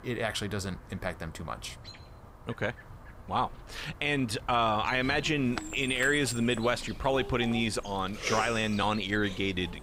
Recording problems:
animal sounds; noticeable; throughout; 15 dB below the speech

